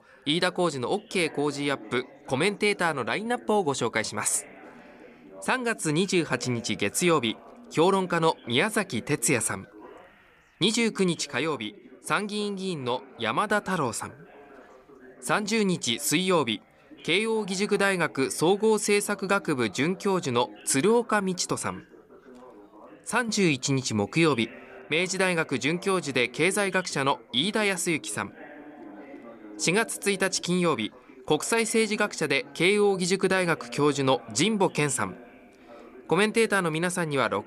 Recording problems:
background chatter; faint; throughout; 4 voices, 20 dB below the speech

